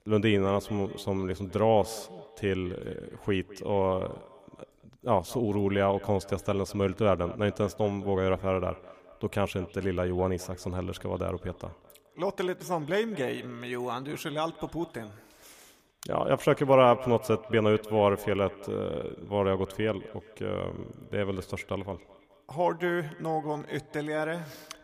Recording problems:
echo of what is said; faint; throughout; 210 ms later, 20 dB below the speech

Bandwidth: 15 kHz